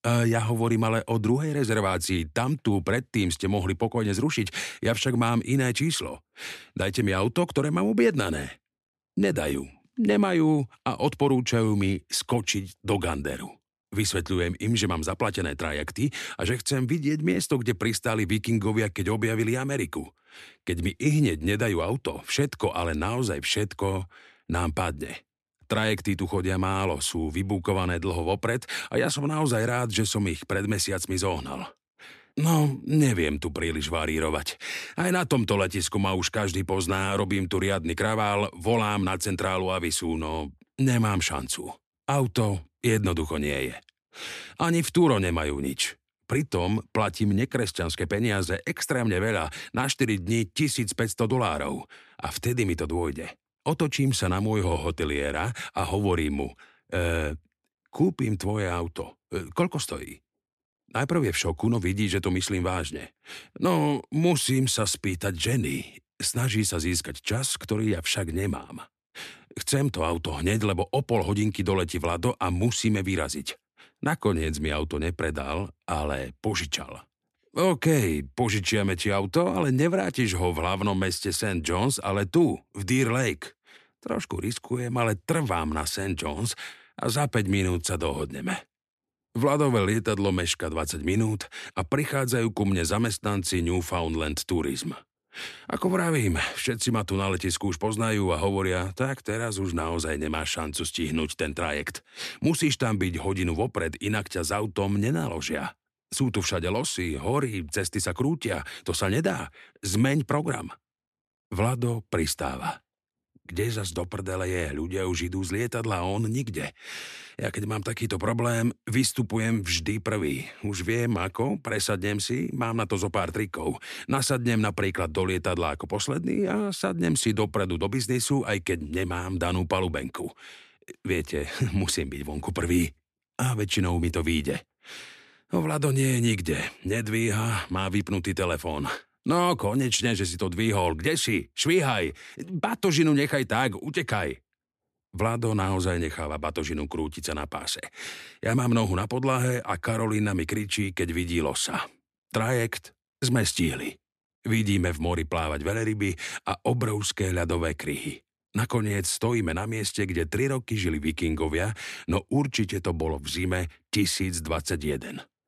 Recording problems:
none

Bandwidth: 13.5 kHz